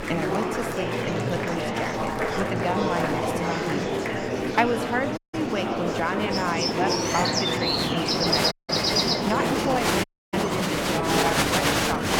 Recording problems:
echo of what is said; noticeable; from 8 s on; 120 ms later, 15 dB below the speech
animal sounds; very loud; throughout; 3 dB above the speech
murmuring crowd; very loud; throughout; 4 dB above the speech
wind noise on the microphone; occasional gusts; 20 dB below the speech
audio cutting out; at 5 s, at 8.5 s and at 10 s

